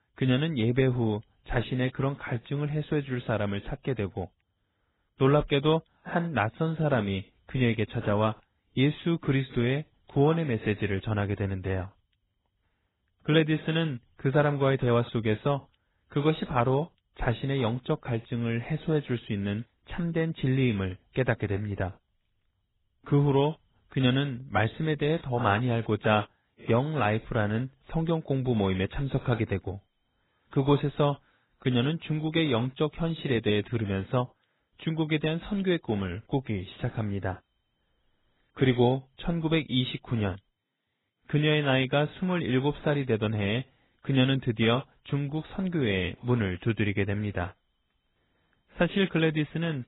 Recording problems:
garbled, watery; badly; nothing above 4 kHz

